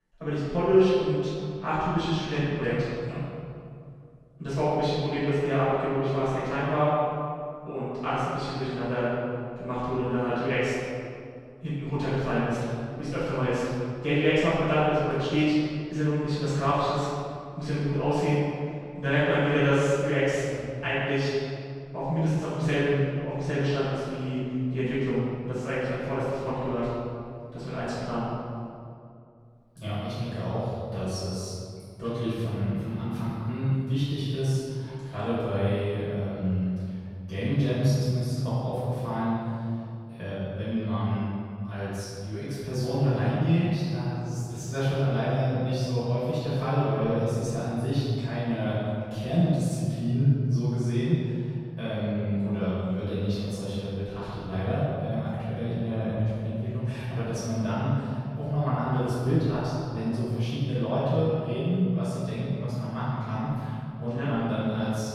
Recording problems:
room echo; strong; dies away in 2.1 s
off-mic speech; far

